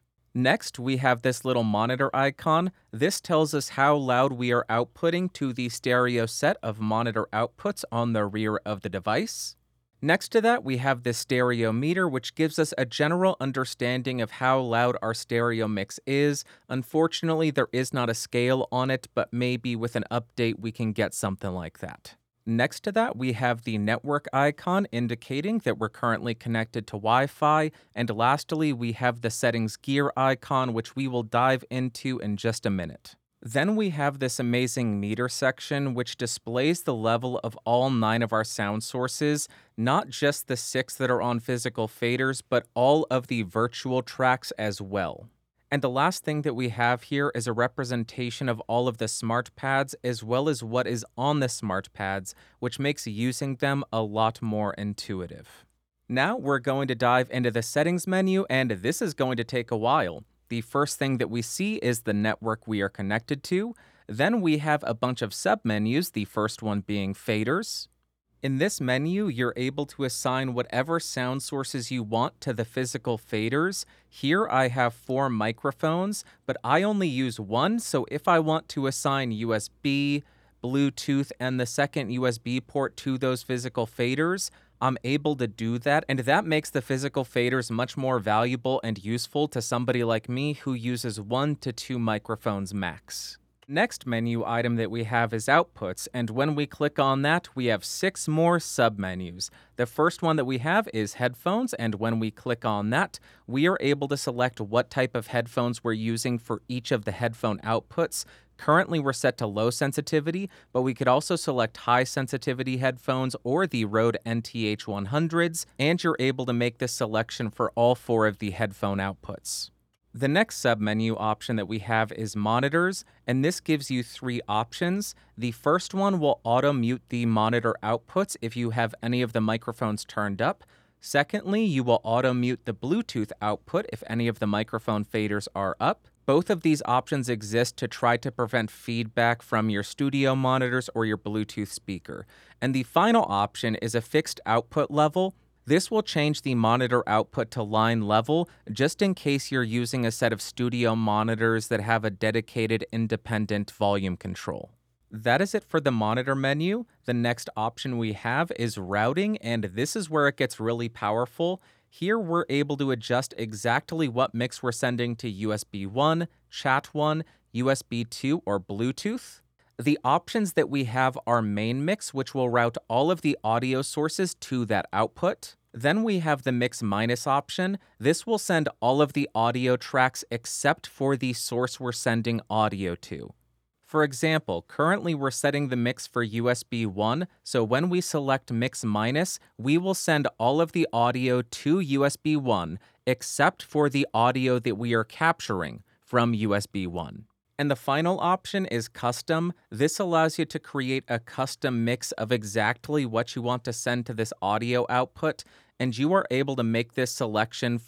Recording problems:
none

